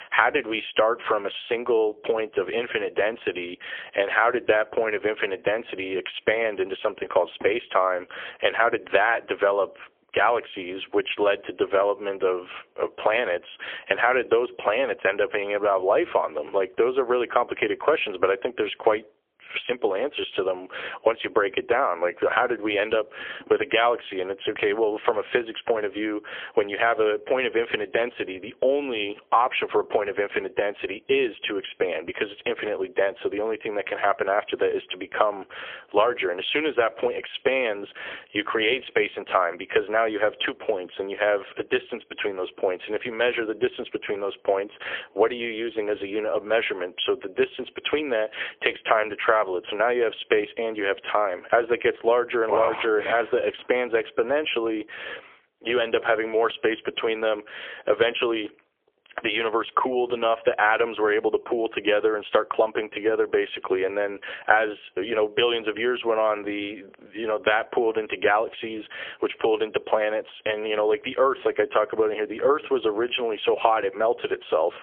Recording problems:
phone-call audio; poor line; nothing above 3.5 kHz
squashed, flat; somewhat

